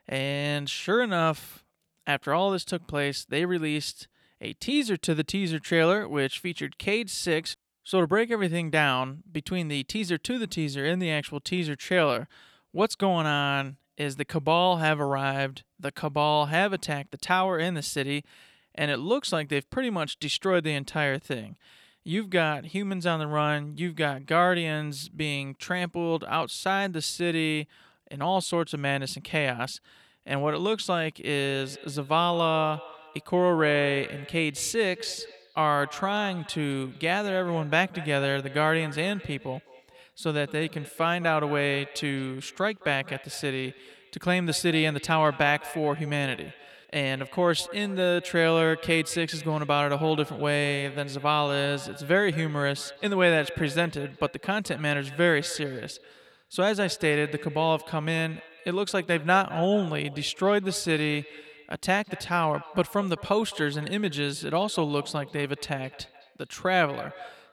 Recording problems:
echo of what is said; noticeable; from 31 s on; 210 ms later, 20 dB below the speech

